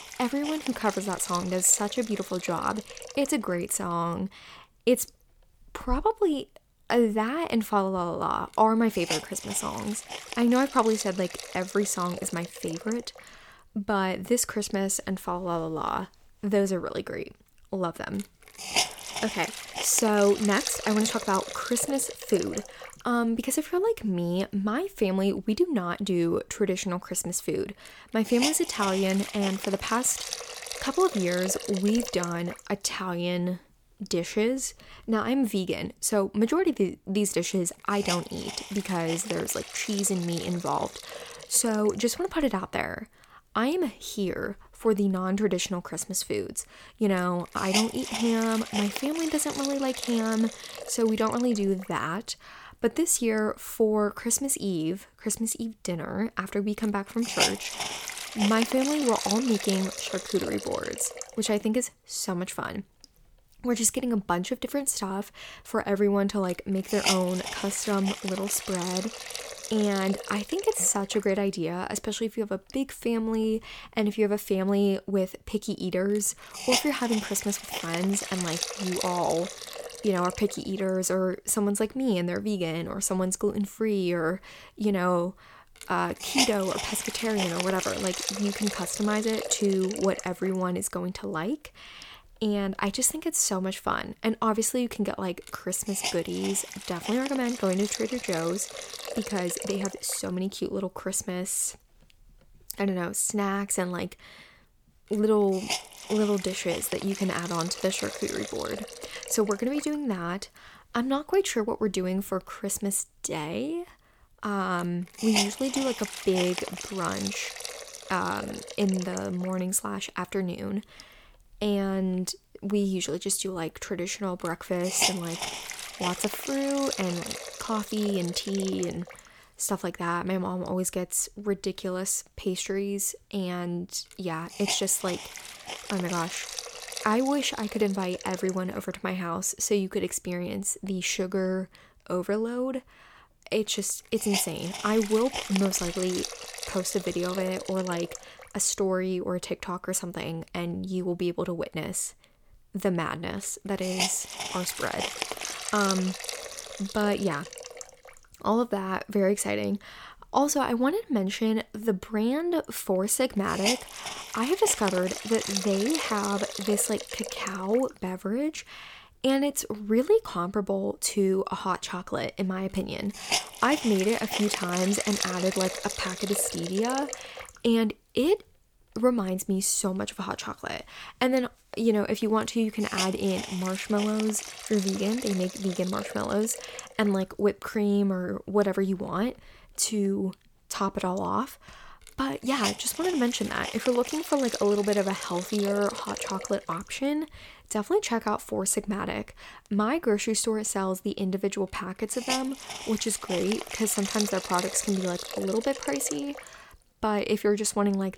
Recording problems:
hiss; loud; throughout; 6 dB below the speech

